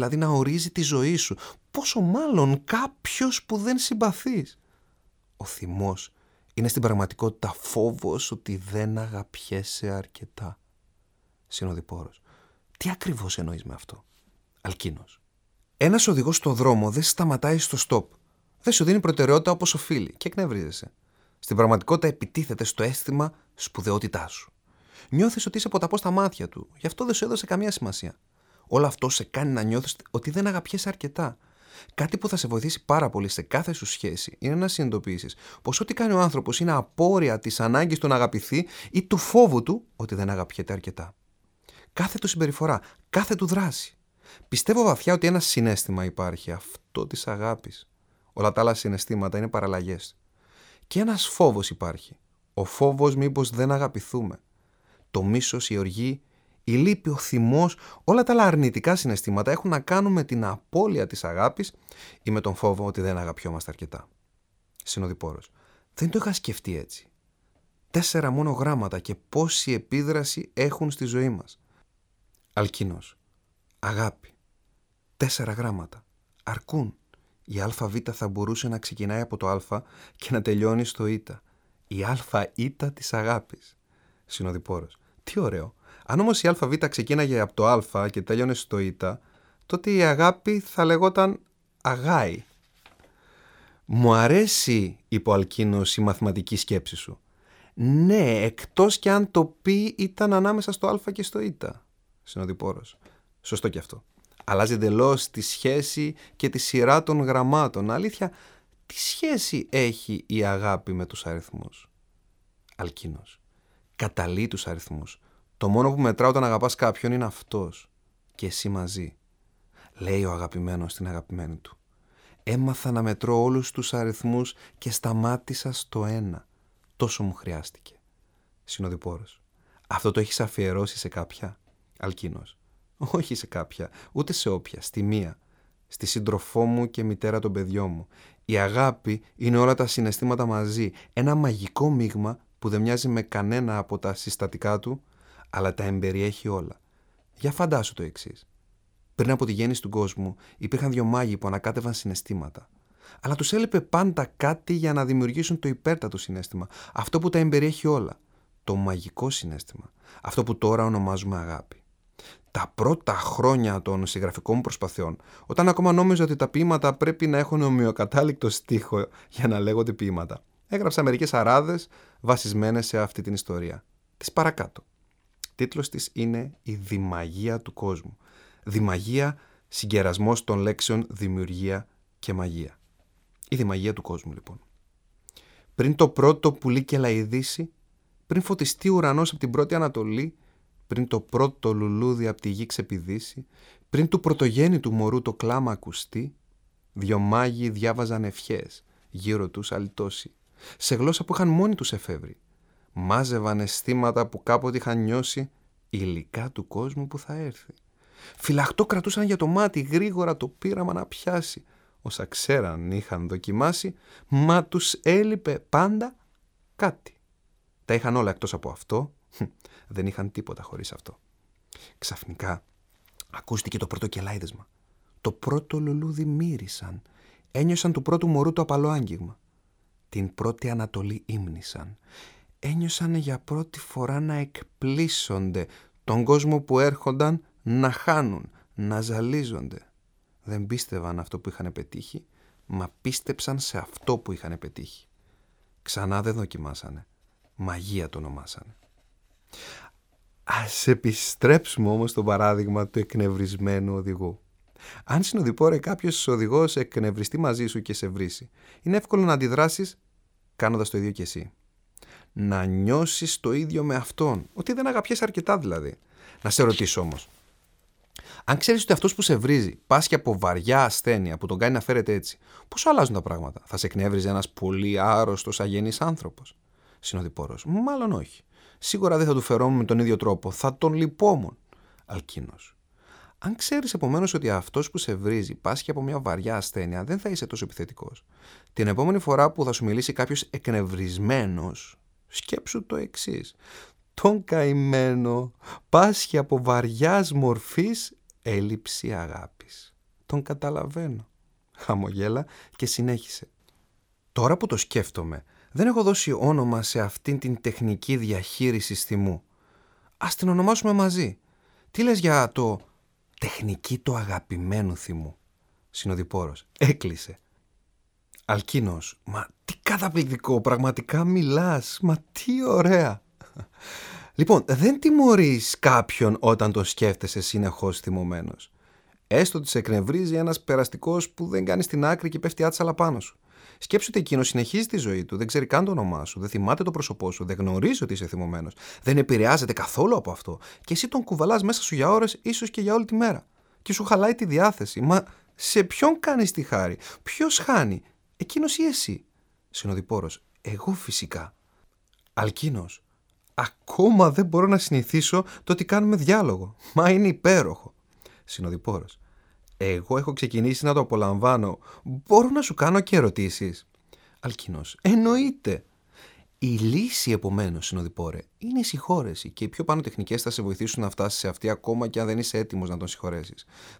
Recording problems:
abrupt cut into speech; at the start

